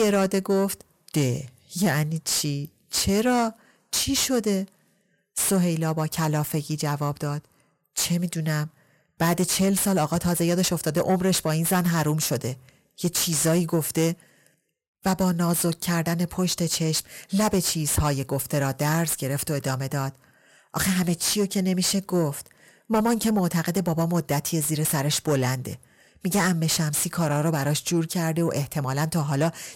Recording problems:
distortion; heavy; 8 dB below the speech
abrupt cut into speech; at the start

